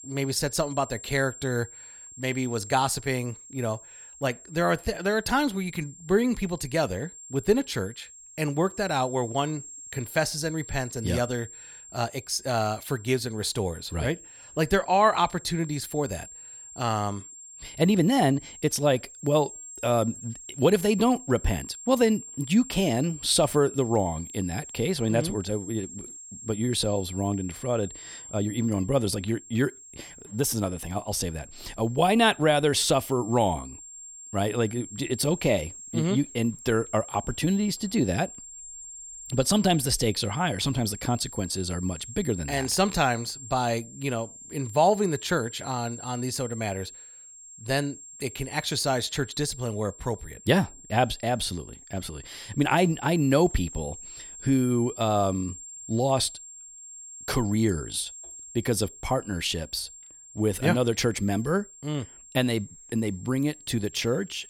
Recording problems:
high-pitched whine; noticeable; throughout; 7.5 kHz, 15 dB below the speech

